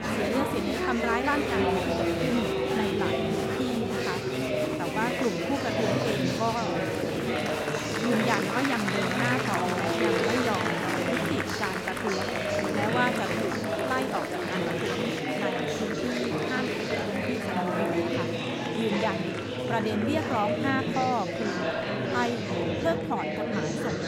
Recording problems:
chatter from many people; very loud; throughout; 3 dB above the speech

